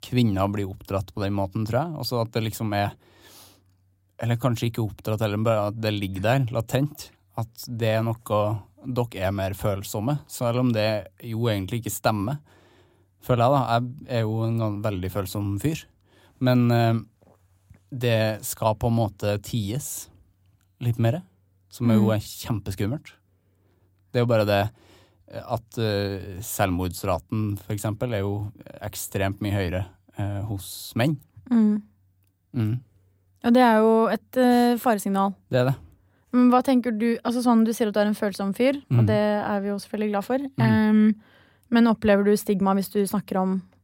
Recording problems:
none

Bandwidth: 16 kHz